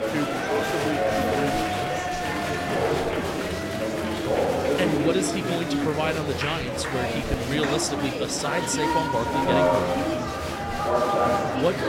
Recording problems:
chatter from many people; very loud; throughout; 4 dB above the speech

